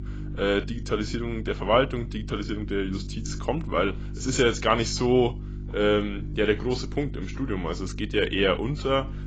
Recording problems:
garbled, watery; badly; nothing above 7.5 kHz
electrical hum; faint; throughout; 50 Hz, 20 dB below the speech

